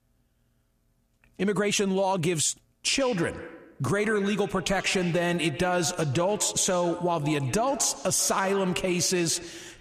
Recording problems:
squashed, flat; heavily
echo of what is said; noticeable; from 3 s on; 140 ms later, 15 dB below the speech

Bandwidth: 14.5 kHz